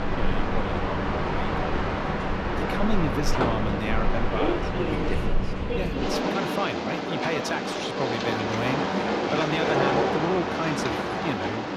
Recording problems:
train or aircraft noise; very loud; throughout; 4 dB above the speech

